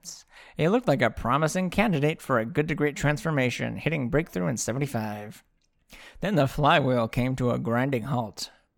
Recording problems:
none

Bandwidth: 18 kHz